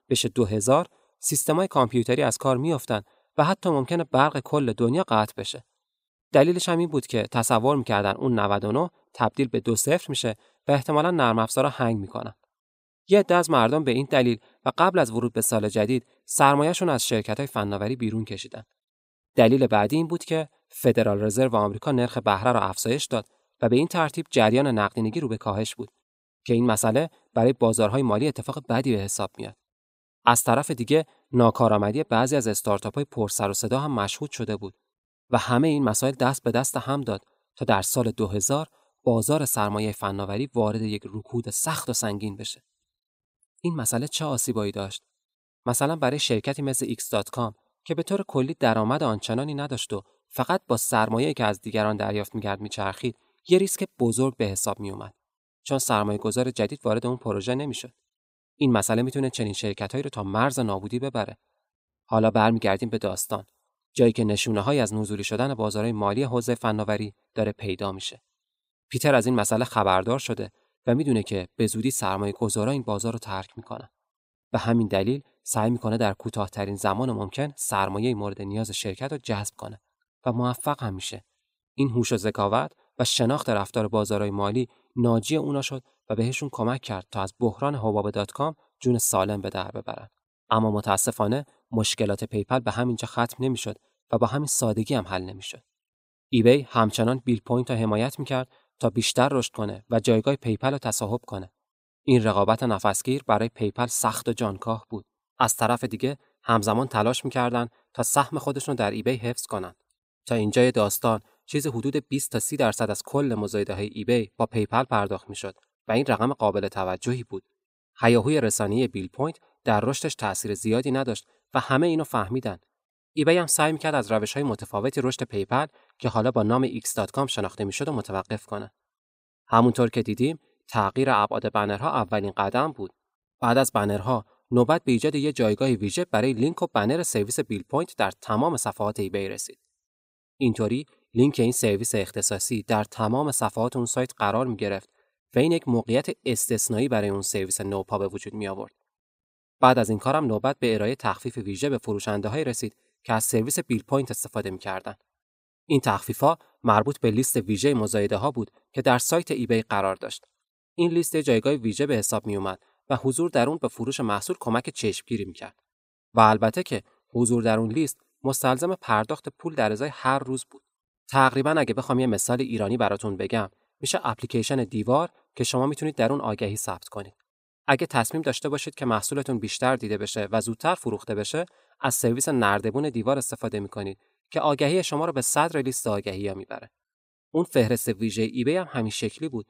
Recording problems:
none

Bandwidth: 15.5 kHz